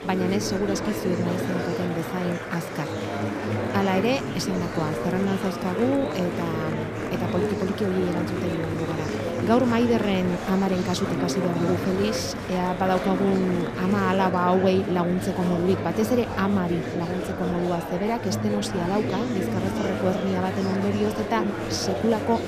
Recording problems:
murmuring crowd; loud; throughout; 3 dB below the speech

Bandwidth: 14.5 kHz